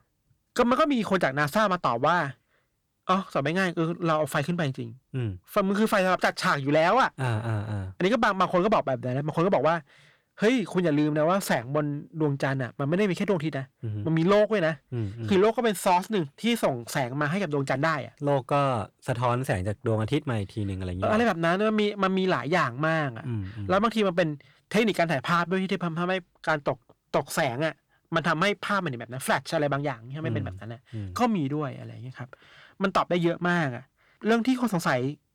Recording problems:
distortion; slight; 10 dB below the speech

